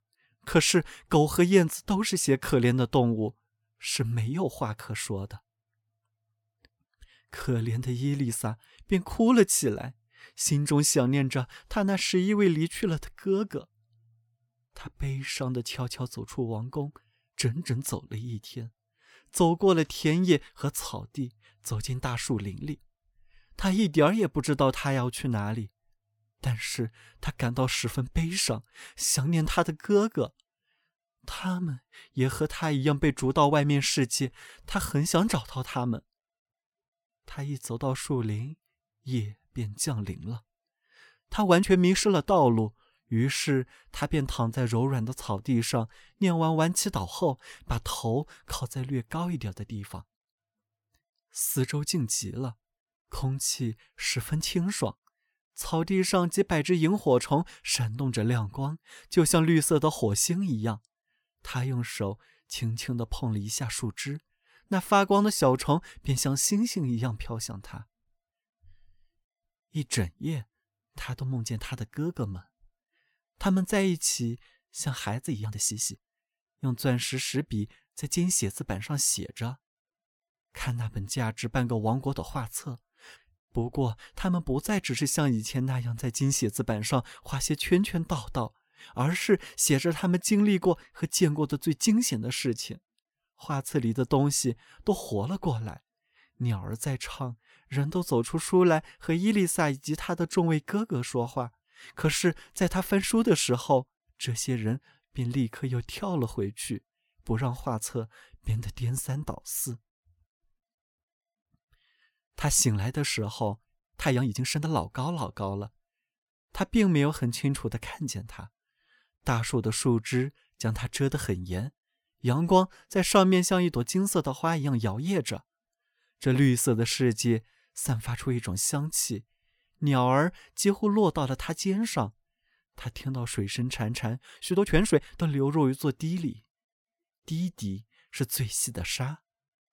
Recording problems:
uneven, jittery; strongly; from 15 s to 2:15

